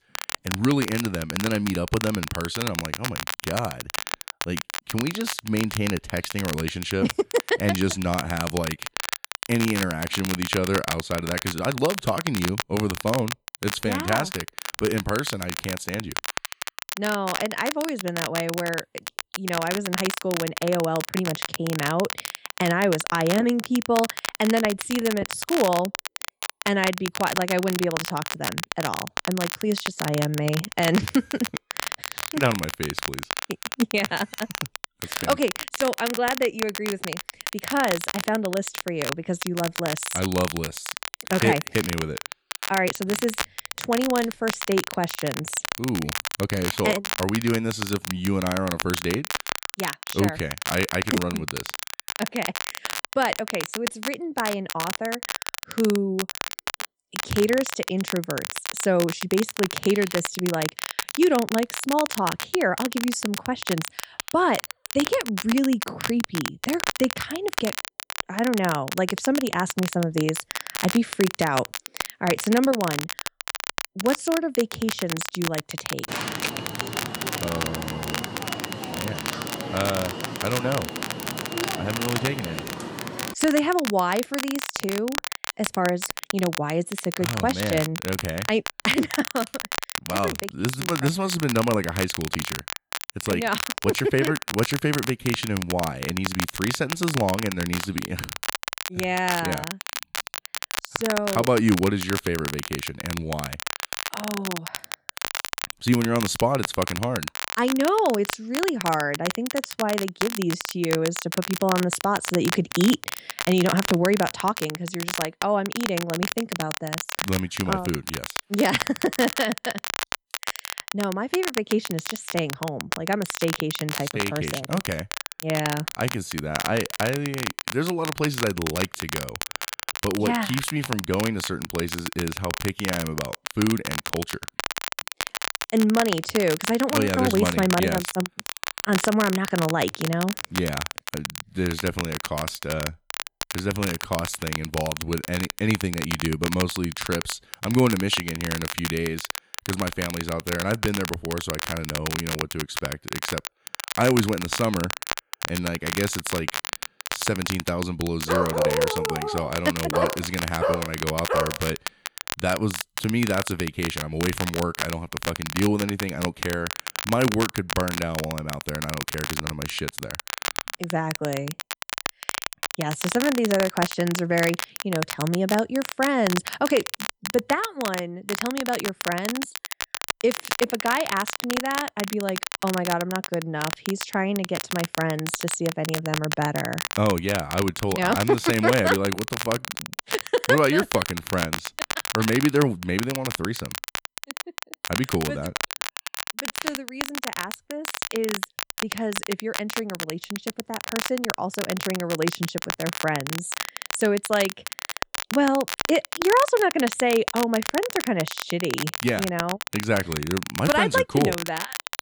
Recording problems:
crackle, like an old record; loud; 5 dB below the speech
alarm; noticeable; from 1:16 to 1:23; peak 2 dB below the speech
dog barking; loud; from 2:38 to 2:42; peak 3 dB above the speech

